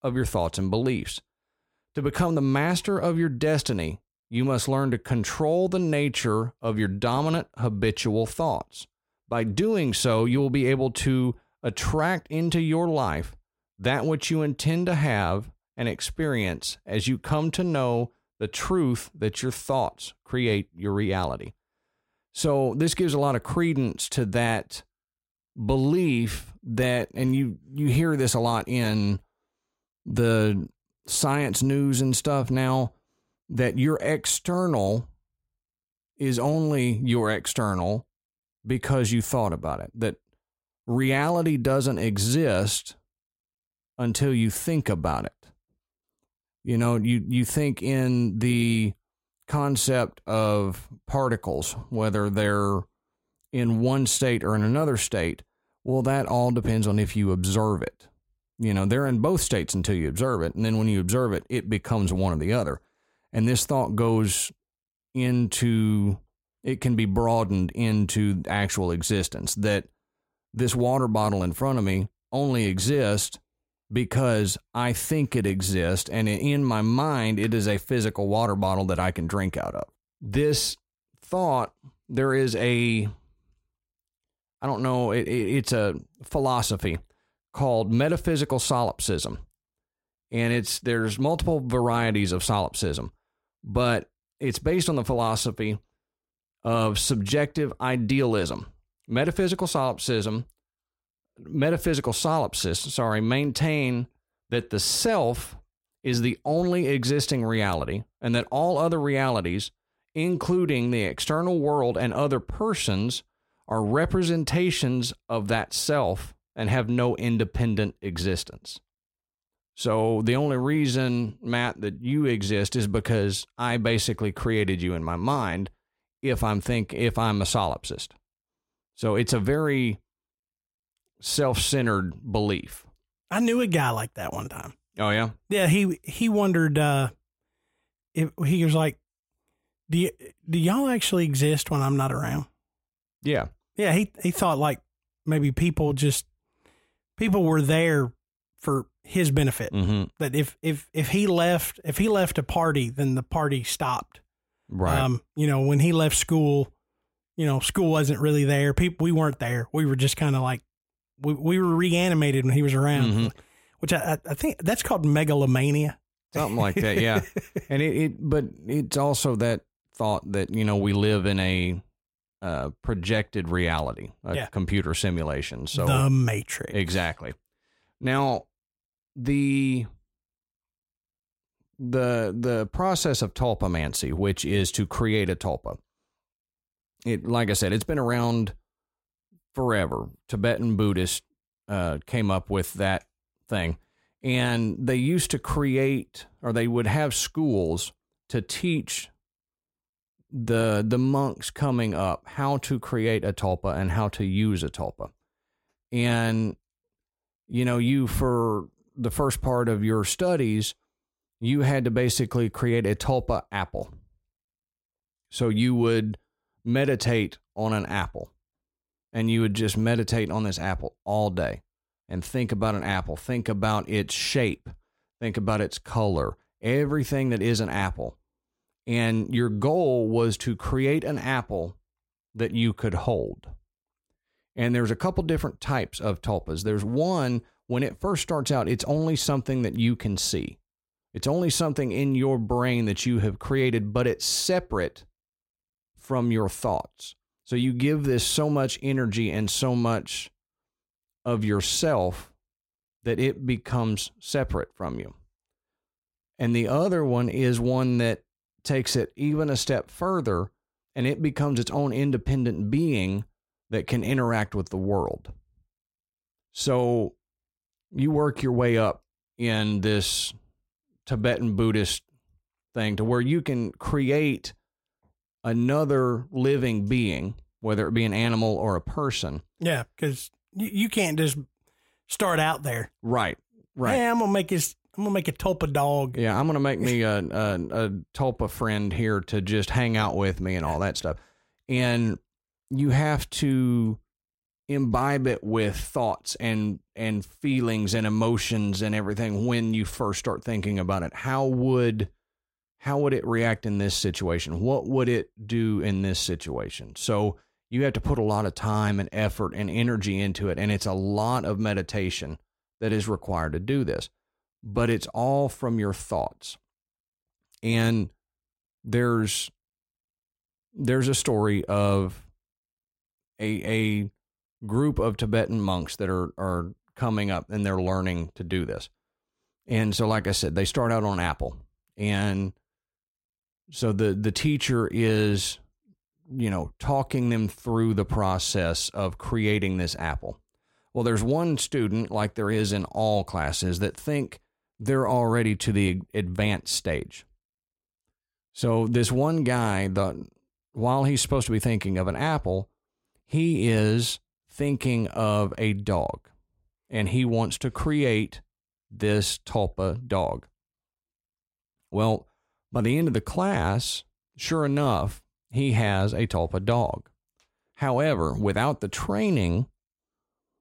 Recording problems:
none

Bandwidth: 16 kHz